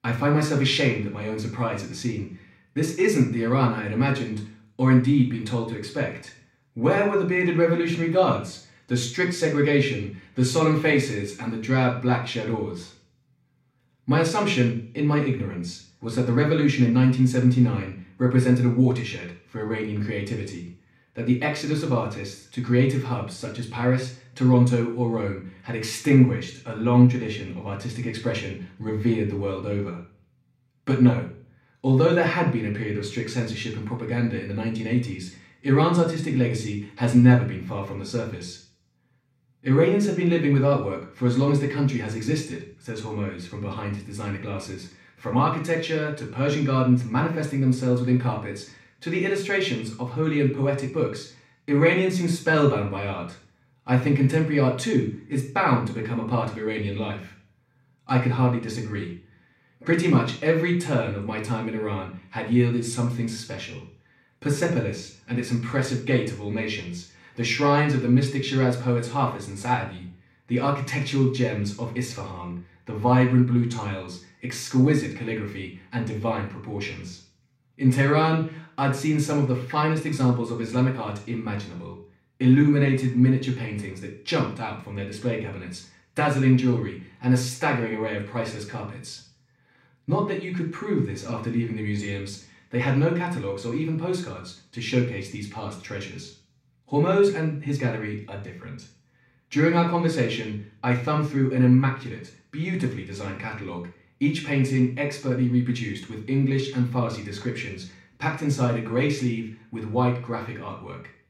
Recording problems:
off-mic speech; far
room echo; slight; dies away in 0.5 s

